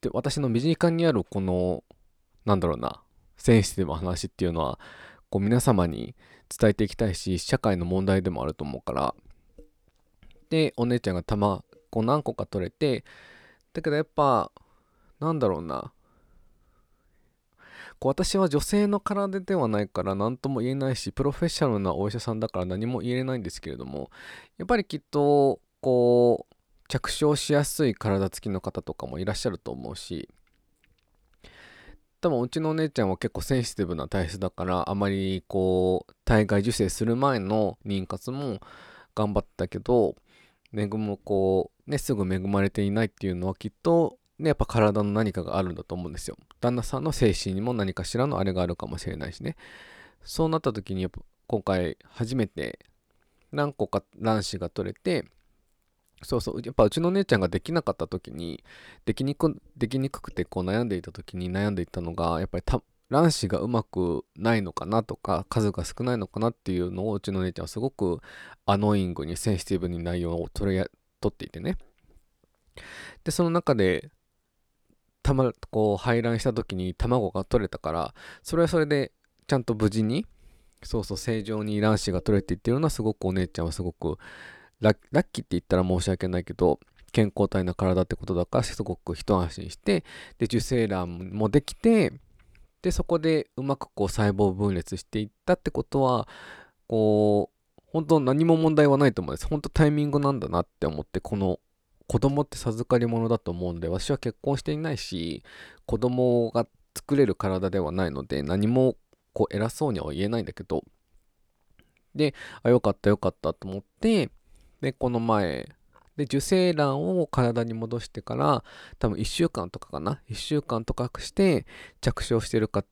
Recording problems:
none

